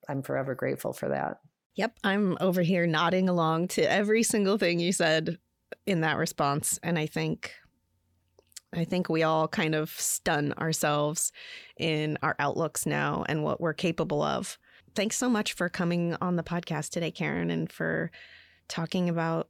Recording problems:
none

